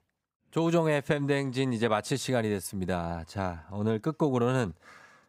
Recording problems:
none

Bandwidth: 15.5 kHz